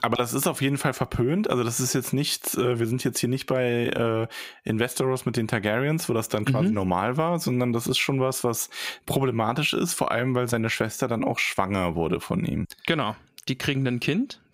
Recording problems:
squashed, flat; somewhat

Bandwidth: 15.5 kHz